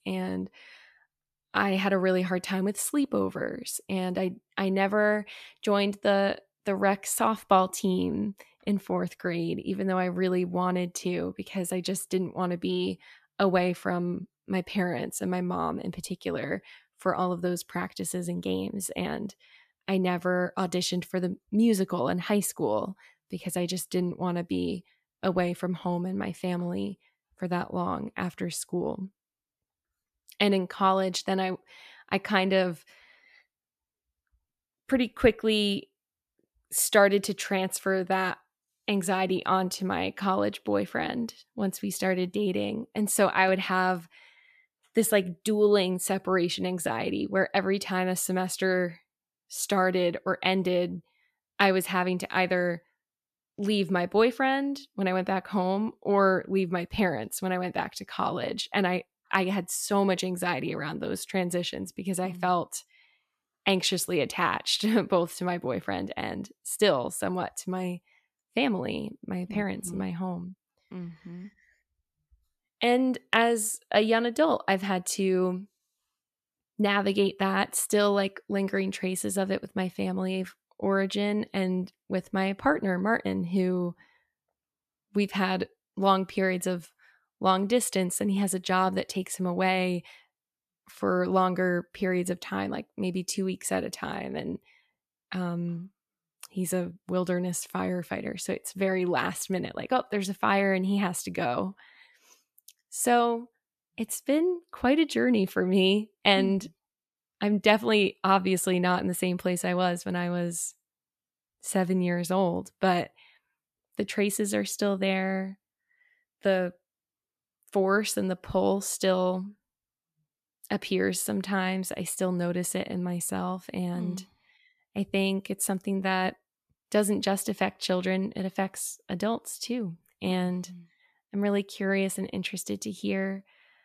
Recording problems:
none

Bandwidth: 14.5 kHz